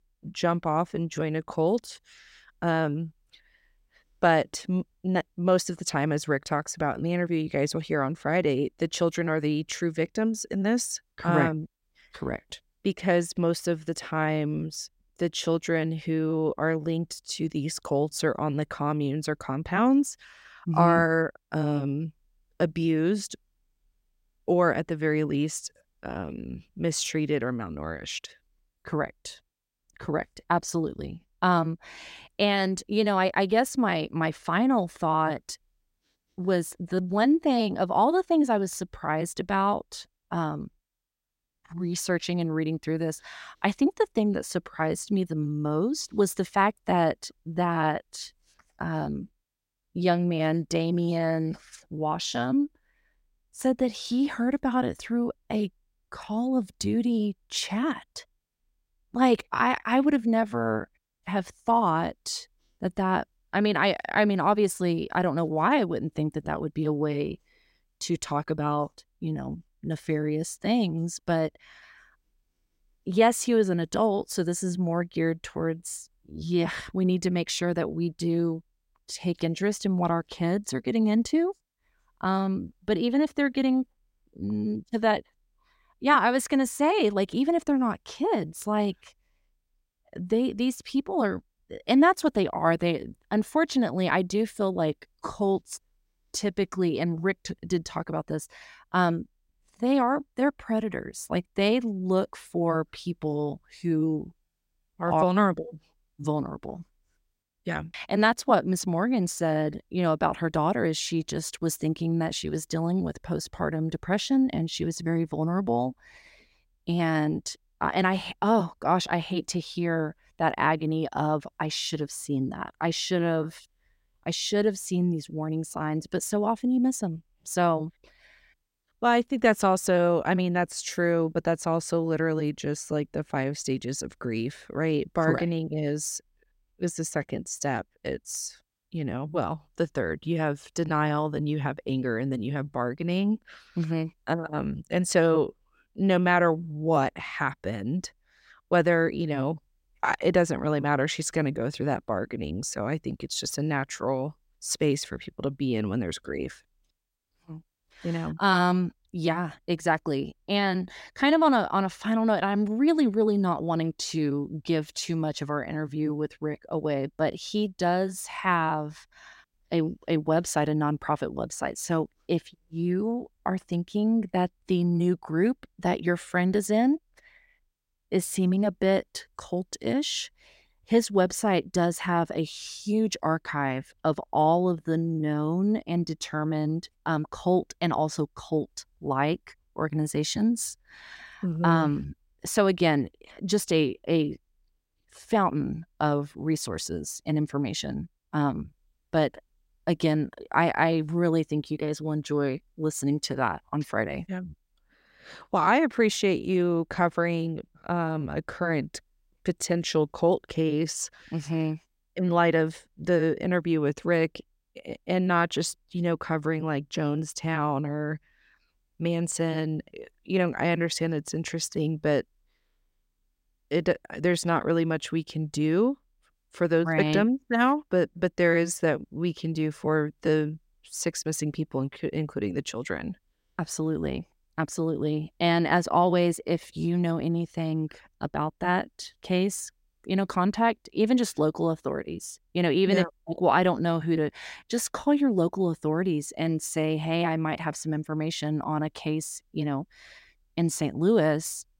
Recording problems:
none

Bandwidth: 16 kHz